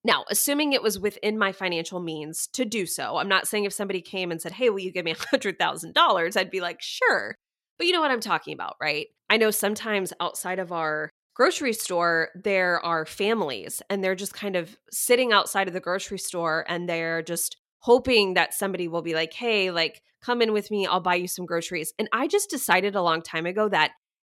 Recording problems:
none

